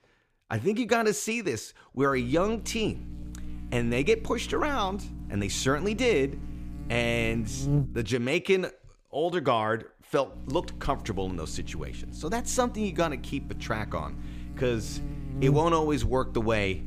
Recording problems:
electrical hum; noticeable; from 2 to 8 s and from 10 s on; 60 Hz, 15 dB below the speech

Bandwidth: 15 kHz